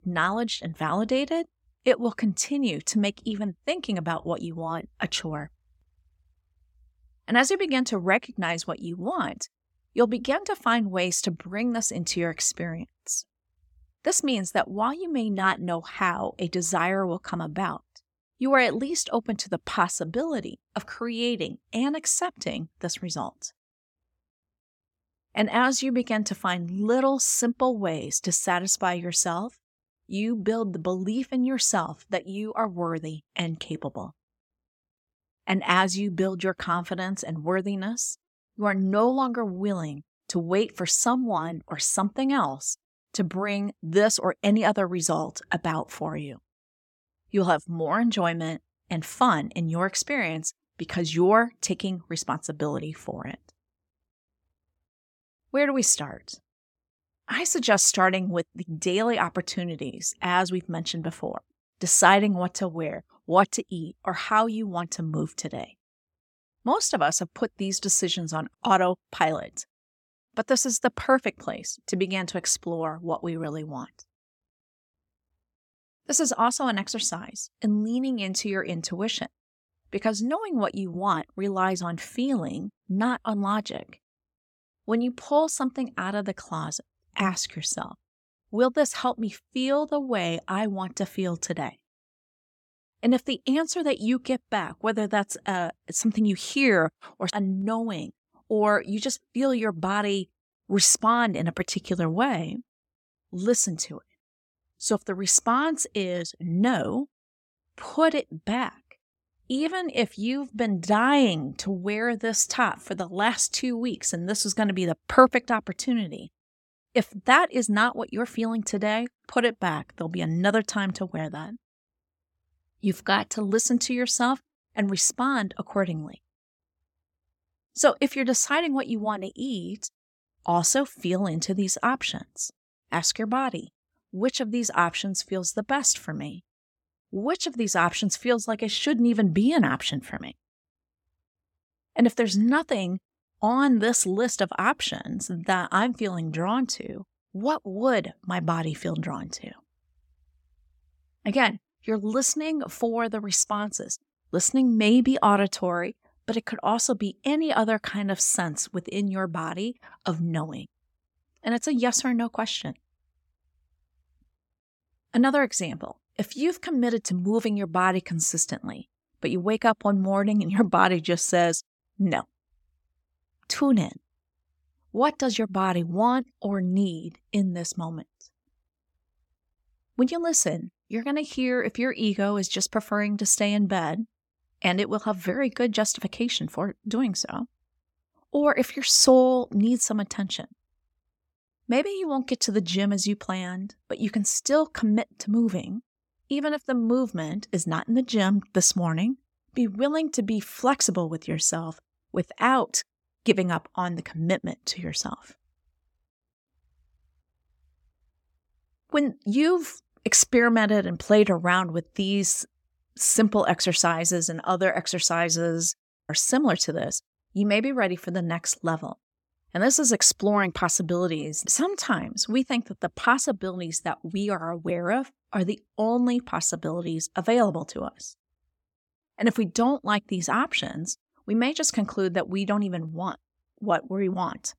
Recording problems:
none

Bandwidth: 17 kHz